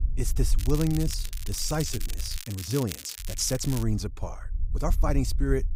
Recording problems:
crackling; loud; from 0.5 to 4 s; 9 dB below the speech
low rumble; faint; until 2.5 s and from 3 s on; 20 dB below the speech
uneven, jittery; strongly; from 1 to 5 s

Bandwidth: 15.5 kHz